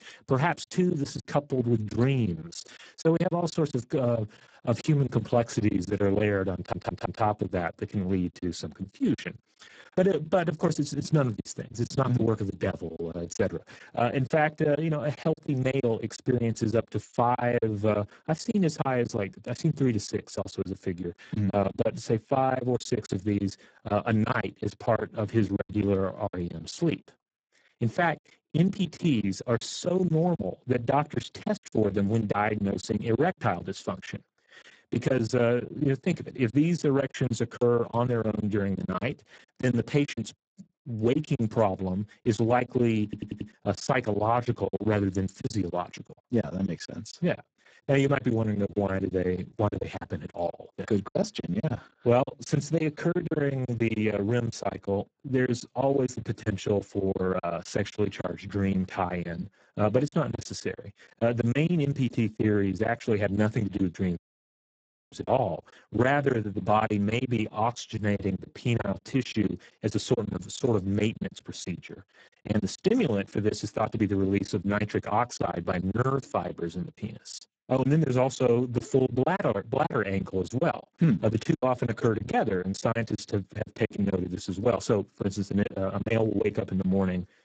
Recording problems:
garbled, watery; badly; nothing above 7.5 kHz
choppy; very; 14% of the speech affected
audio stuttering; at 6.5 s and at 43 s
audio cutting out; at 1:04 for 1 s

